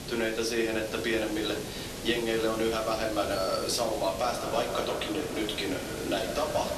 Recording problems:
echo of what is said; strong; from 4.5 s on; 130 ms later, 10 dB below the speech
off-mic speech; far
thin; somewhat; fading below 300 Hz
room echo; slight; dies away in 0.3 s
hiss; loud; throughout; 8 dB below the speech

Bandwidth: 13.5 kHz